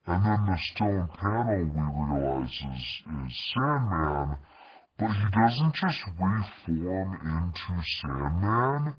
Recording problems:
garbled, watery; badly
wrong speed and pitch; too slow and too low; 0.6 times normal speed

